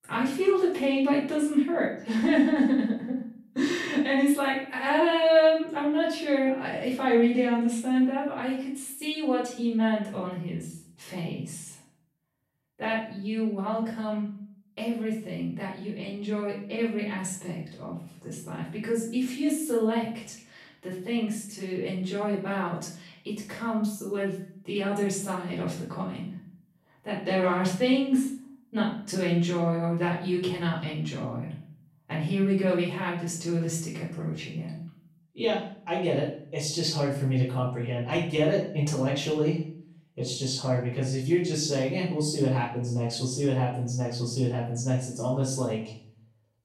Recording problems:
off-mic speech; far
room echo; noticeable; dies away in 0.5 s

